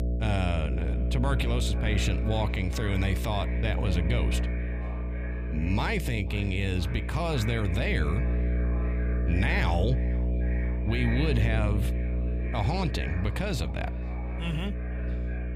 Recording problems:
echo of what is said; noticeable; throughout; 490 ms later, 15 dB below the speech
electrical hum; loud; throughout; 60 Hz, 9 dB below the speech

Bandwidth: 15 kHz